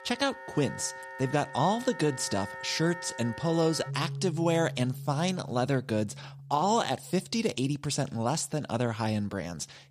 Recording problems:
background music; noticeable; throughout; 10 dB below the speech

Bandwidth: 15 kHz